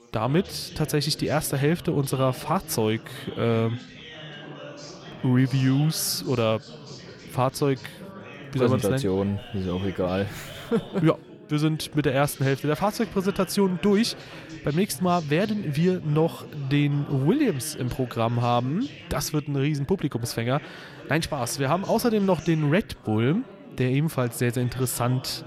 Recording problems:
chatter from many people; noticeable; throughout; 15 dB below the speech

